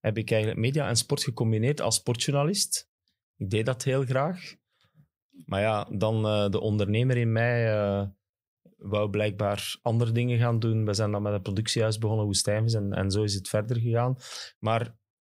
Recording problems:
none

